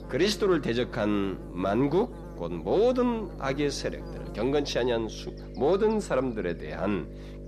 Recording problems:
electrical hum; noticeable; throughout; 50 Hz, 15 dB below the speech

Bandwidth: 13.5 kHz